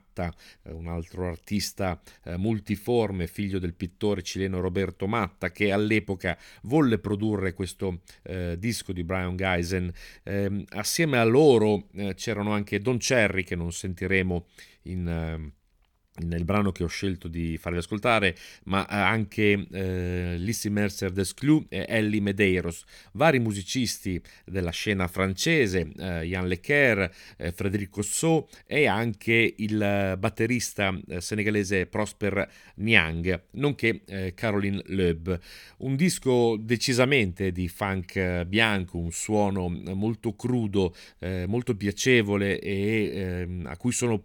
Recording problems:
none

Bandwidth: 18.5 kHz